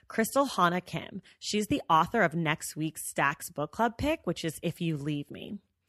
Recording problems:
none

